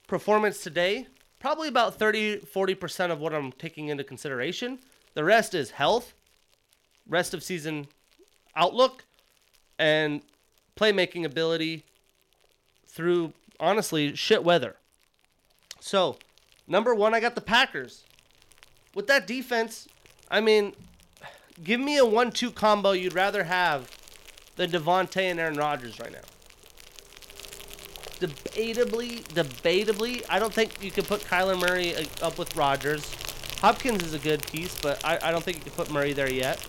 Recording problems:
animal sounds; noticeable; throughout; 15 dB below the speech

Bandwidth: 16.5 kHz